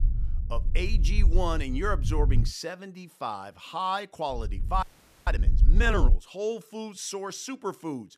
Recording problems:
low rumble; noticeable; until 2.5 s and from 4.5 to 6 s; 15 dB below the speech
audio freezing; at 5 s

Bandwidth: 14.5 kHz